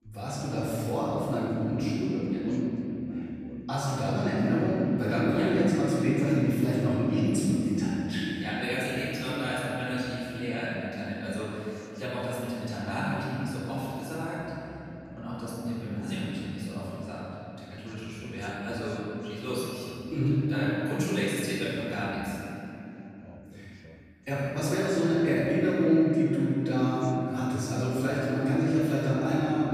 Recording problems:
room echo; strong; dies away in 3 s
off-mic speech; far
voice in the background; faint; throughout; 20 dB below the speech

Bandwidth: 14.5 kHz